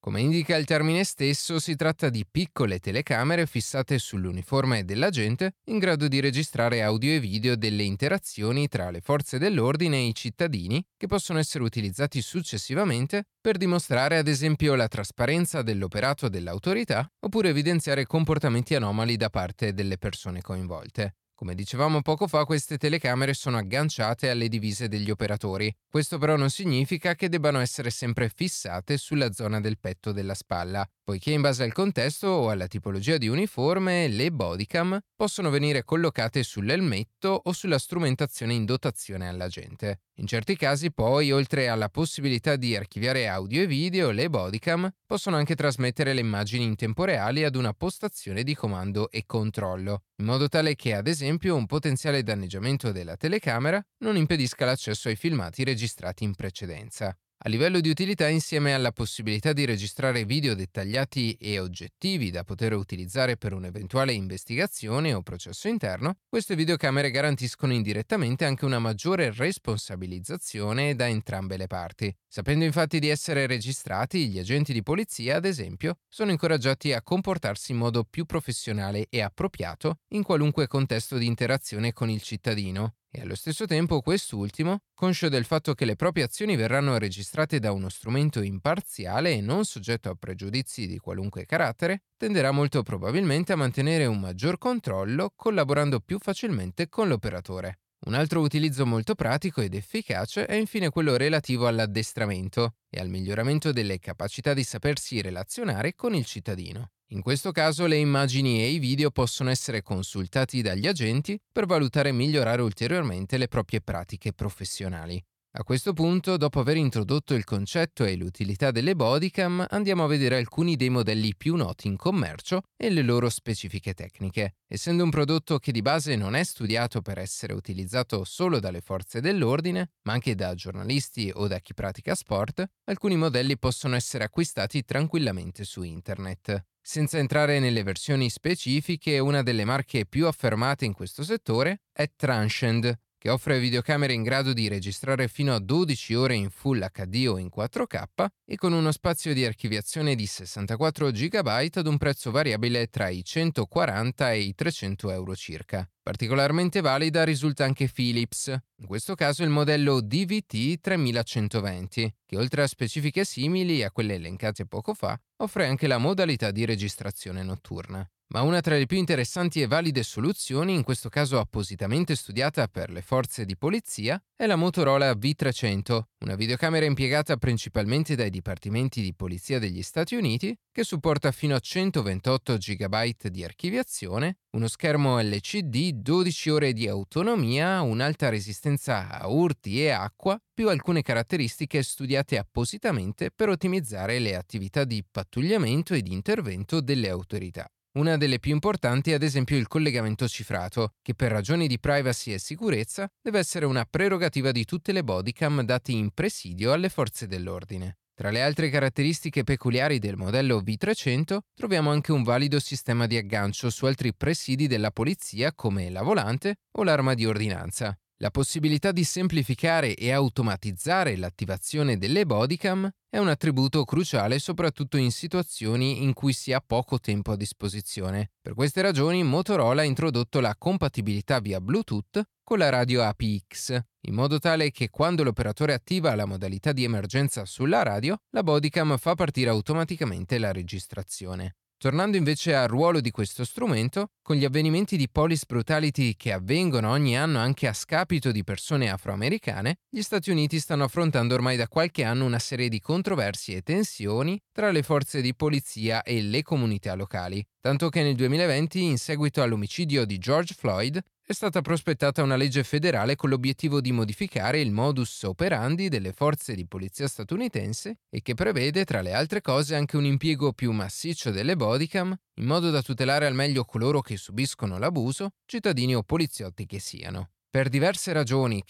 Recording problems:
none

